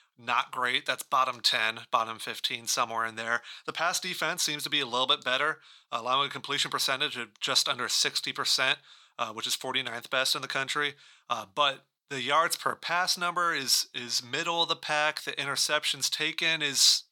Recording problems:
thin; very; fading below 500 Hz

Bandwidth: 17.5 kHz